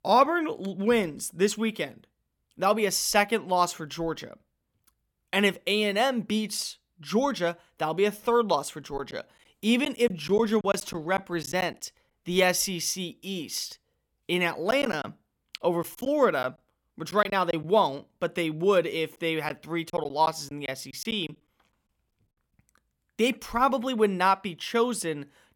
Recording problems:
choppy; very; from 9 to 12 s, from 15 to 18 s and from 19 to 21 s; 9% of the speech affected

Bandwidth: 18 kHz